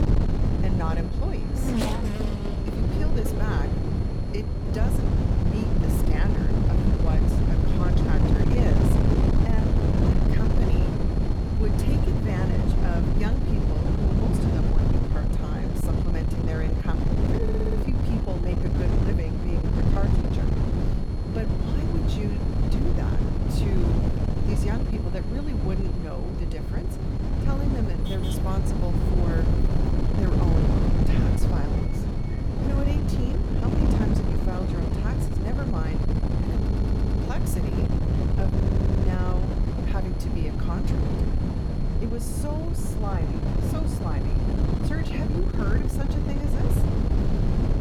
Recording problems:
wind noise on the microphone; heavy; 4 dB above the speech
traffic noise; loud; throughout; 4 dB below the speech
high-pitched whine; noticeable; throughout; 4.5 kHz, 20 dB below the speech
audio stuttering; at 17 s, at 37 s and at 39 s

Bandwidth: 18.5 kHz